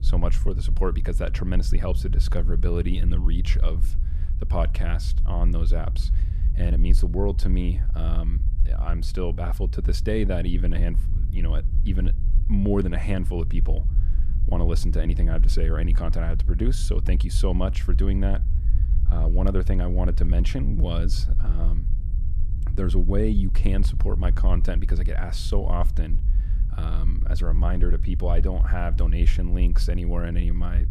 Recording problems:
low rumble; noticeable; throughout; 10 dB below the speech

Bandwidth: 14.5 kHz